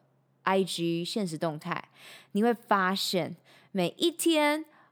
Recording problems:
none

